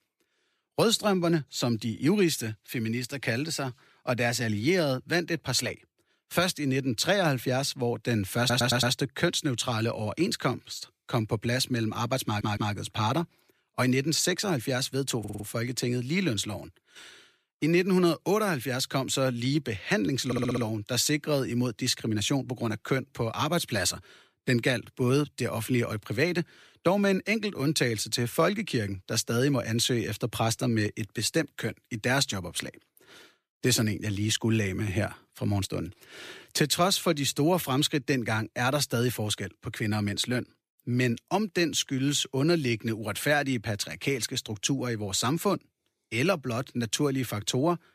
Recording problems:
audio stuttering; 4 times, first at 8.5 s

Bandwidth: 14.5 kHz